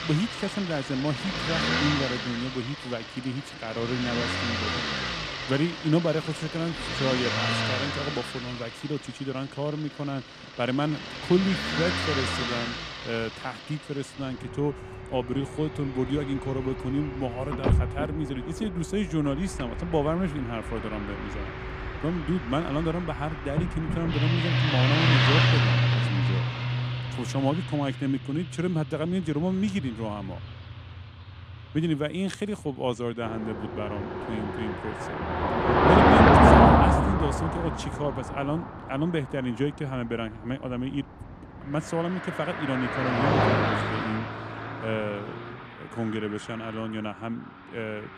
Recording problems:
traffic noise; very loud; throughout; 4 dB above the speech

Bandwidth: 14.5 kHz